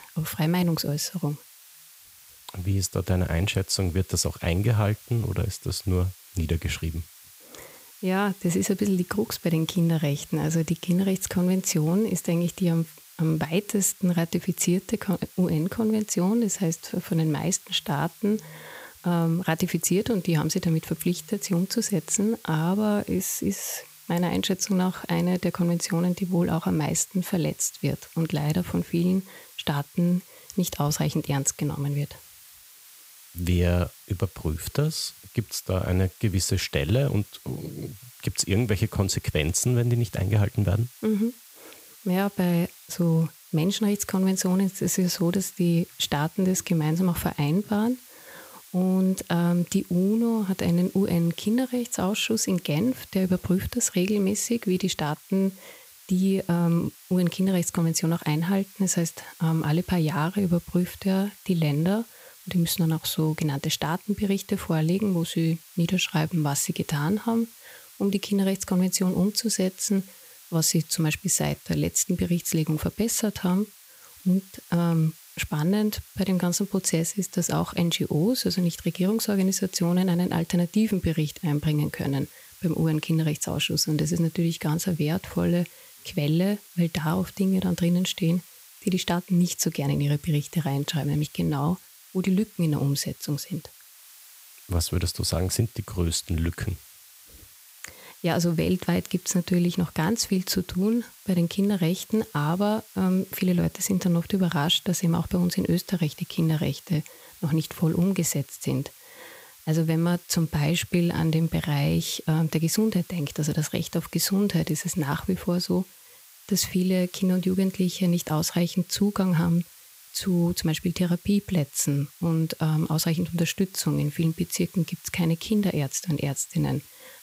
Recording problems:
hiss; faint; throughout; 20 dB below the speech

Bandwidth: 15.5 kHz